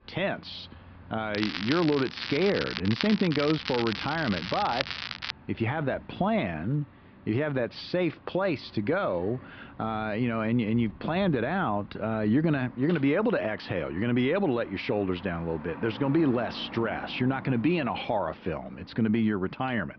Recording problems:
high frequencies cut off; noticeable; nothing above 5.5 kHz
muffled; very slightly; fading above 2.5 kHz
crackling; loud; from 1.5 to 5.5 s; 6 dB below the speech
traffic noise; noticeable; throughout; 20 dB below the speech

